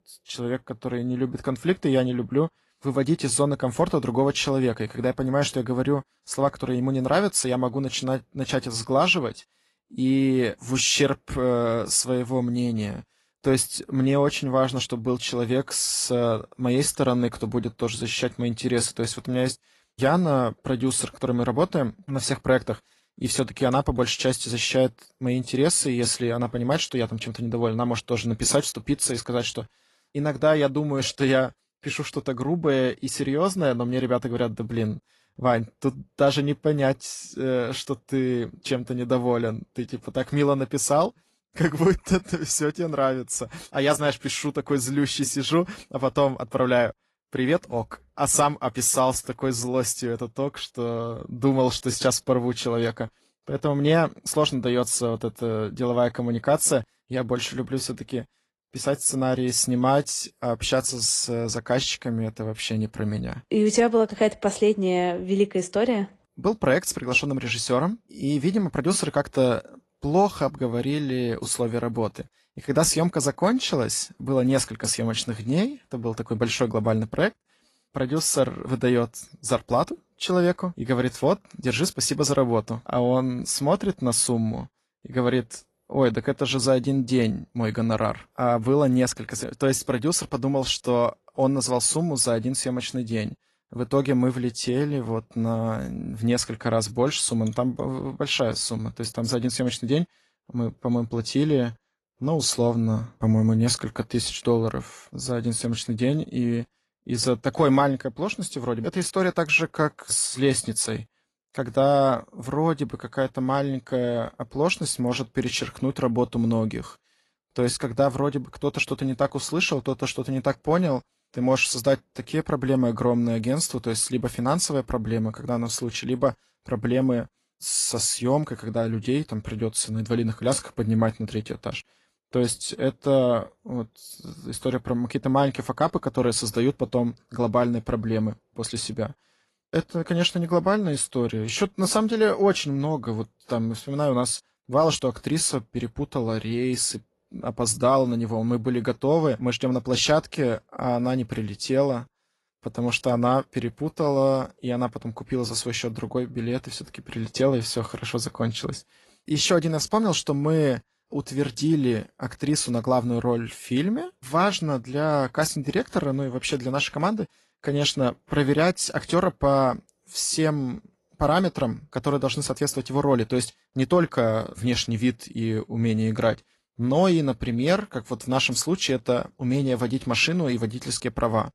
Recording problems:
garbled, watery; slightly

